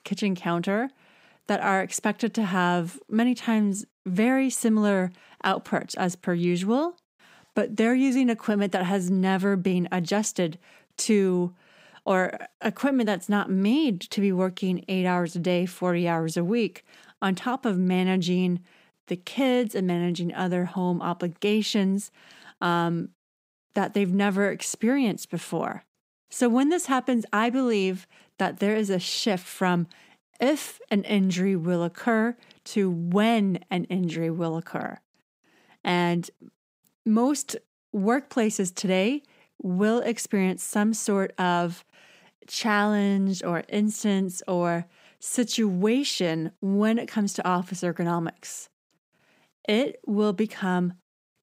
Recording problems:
none

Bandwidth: 15.5 kHz